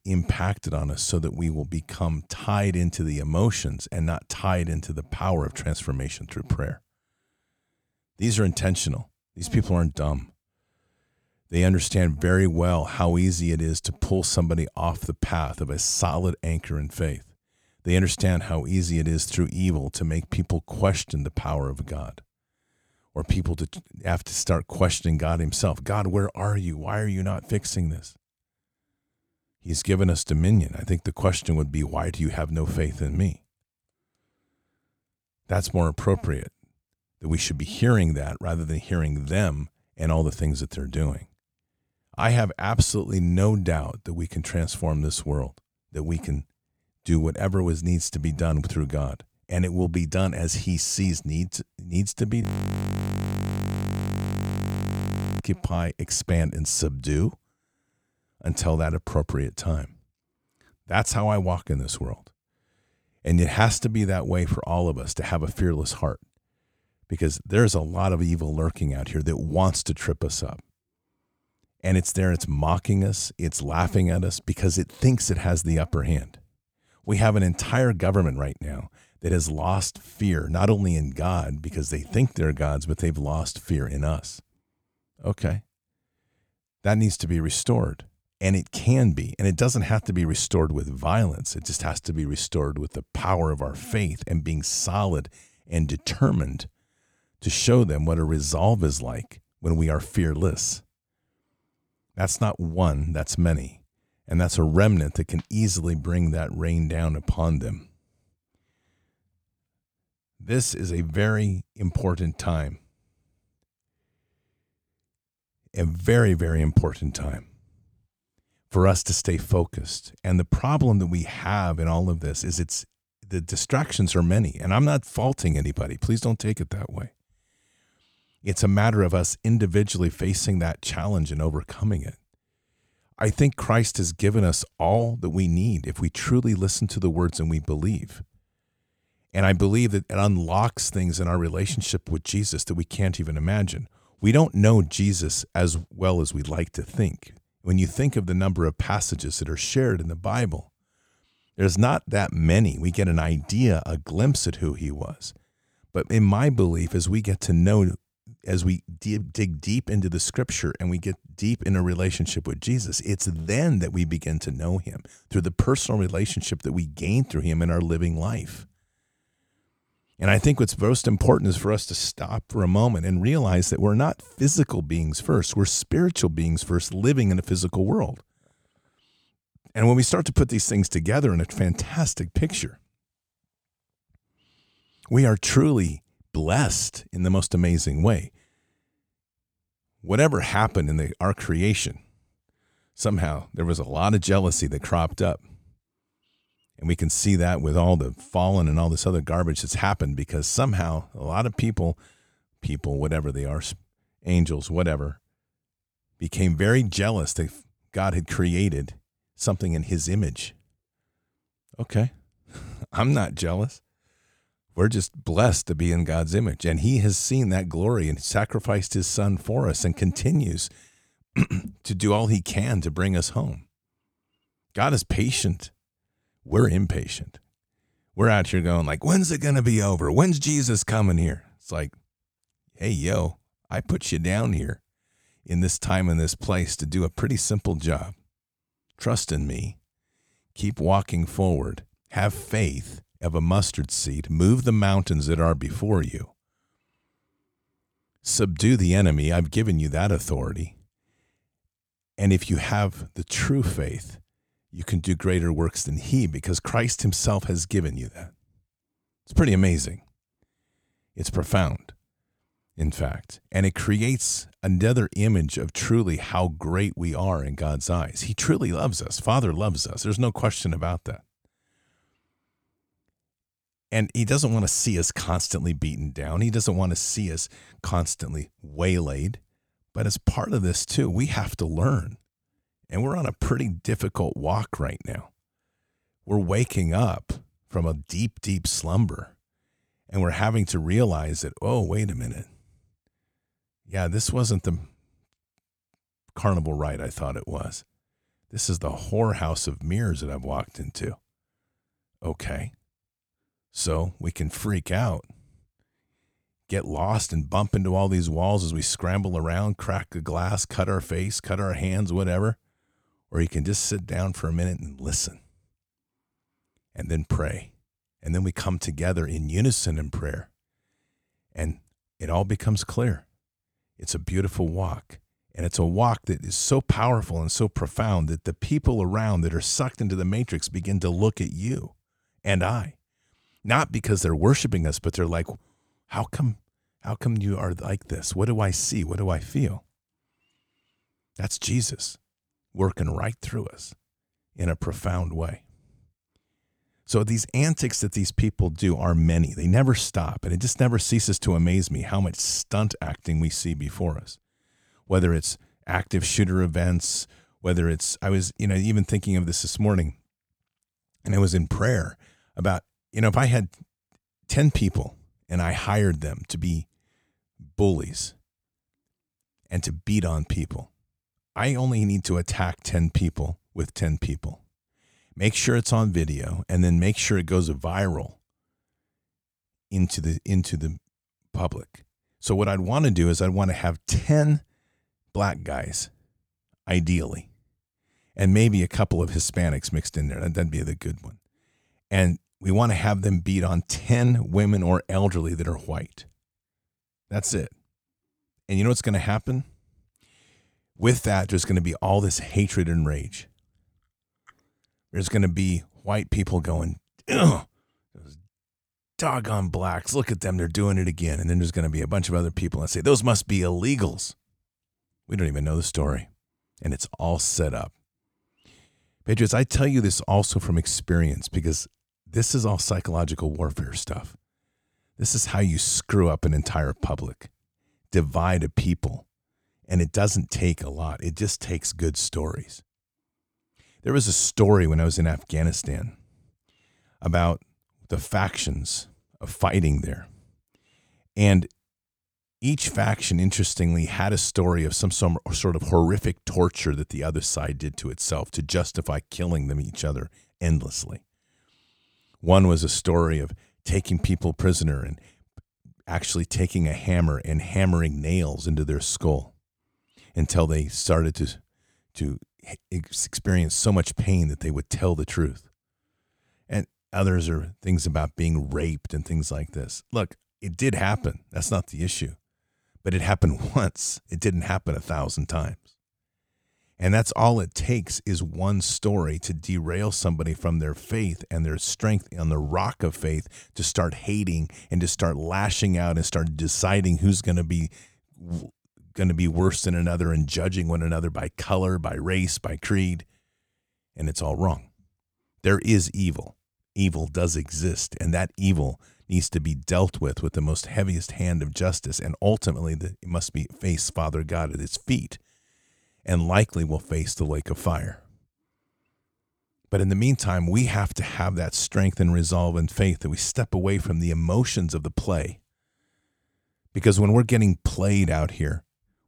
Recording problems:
audio freezing; at 52 s for 3 s

